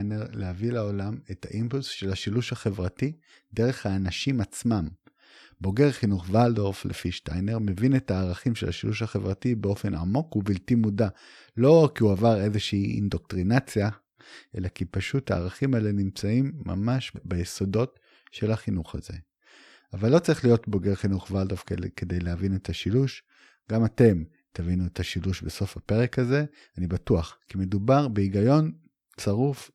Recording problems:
abrupt cut into speech; at the start

